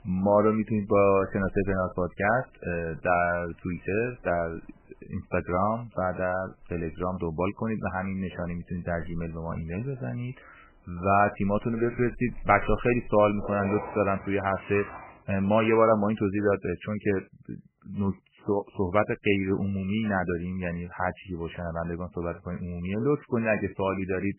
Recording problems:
garbled, watery; badly; nothing above 2.5 kHz
rain or running water; noticeable; until 15 s; 15 dB below the speech

